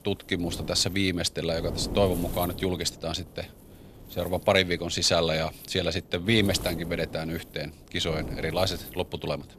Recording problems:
wind noise on the microphone; occasional gusts; 15 dB below the speech

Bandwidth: 14.5 kHz